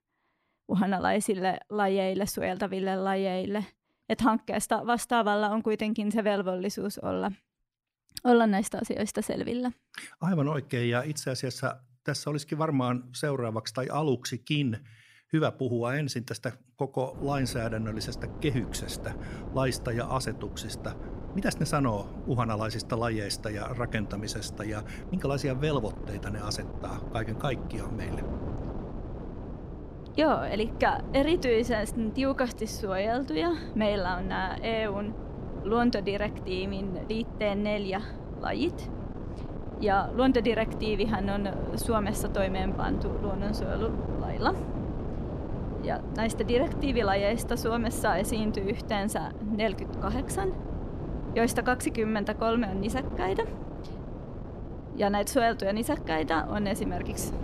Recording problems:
wind noise on the microphone; occasional gusts; from 17 s on; 10 dB below the speech

